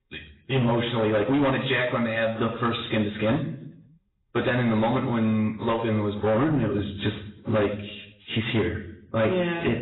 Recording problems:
off-mic speech; far
garbled, watery; badly; nothing above 4 kHz
room echo; slight; dies away in 0.6 s
distortion; slight; 11% of the sound clipped

